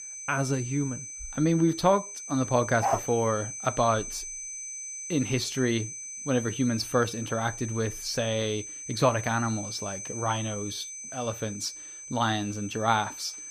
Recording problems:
high-pitched whine; loud; throughout; 6 kHz, 8 dB below the speech
dog barking; noticeable; at 3 s; peak 1 dB below the speech

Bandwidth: 15 kHz